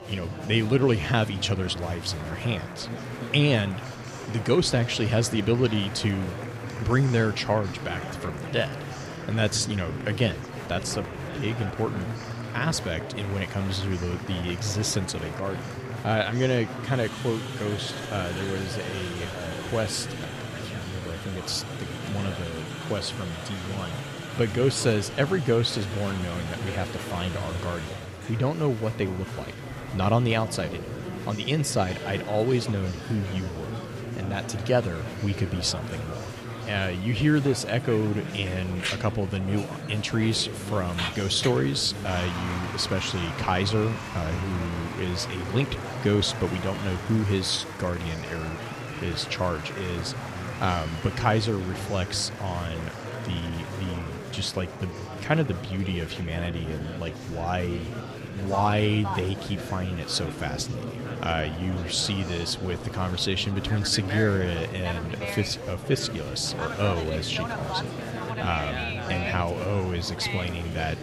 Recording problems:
murmuring crowd; loud; throughout; 7 dB below the speech

